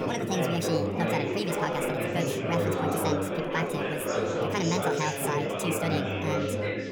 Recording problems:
wrong speed and pitch; too fast and too high; 1.5 times normal speed
chatter from many people; very loud; throughout; 3 dB above the speech

